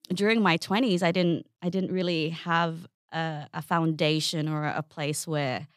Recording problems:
none

